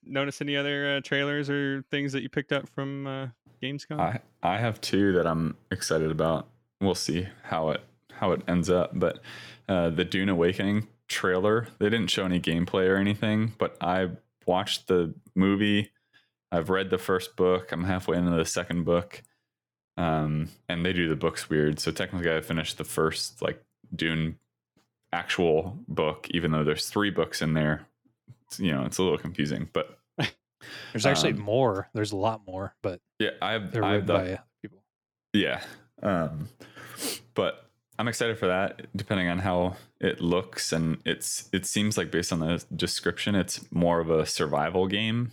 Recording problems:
none

